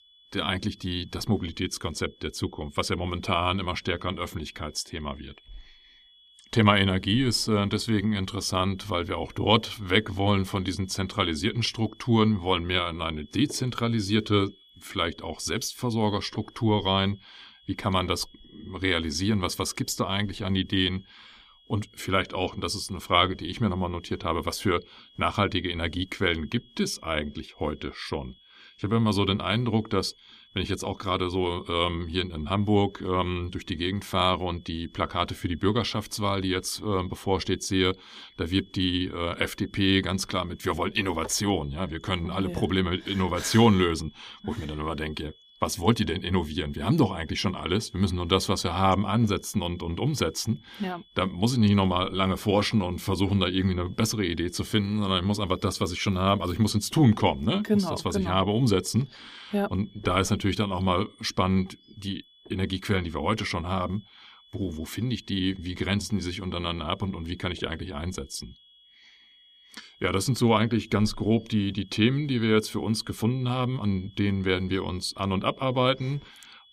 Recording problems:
high-pitched whine; faint; throughout; 3.5 kHz, 30 dB below the speech
uneven, jittery; slightly; from 8 s to 1:14

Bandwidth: 15 kHz